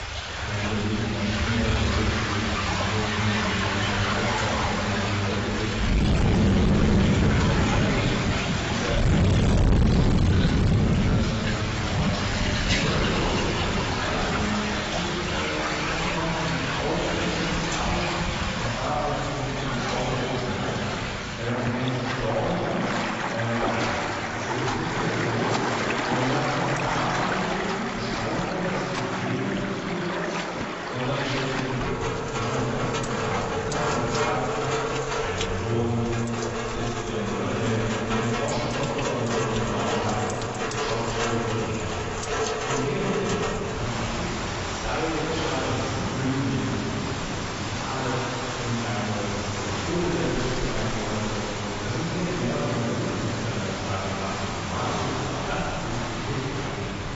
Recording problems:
distortion; heavy; 6 dB below the speech
room echo; strong; dies away in 2.5 s
off-mic speech; far
garbled, watery; badly; nothing above 7.5 kHz
rain or running water; very loud; throughout; 3 dB above the speech

